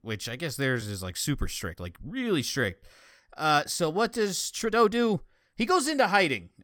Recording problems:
uneven, jittery; strongly; from 0.5 to 6 s

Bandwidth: 17 kHz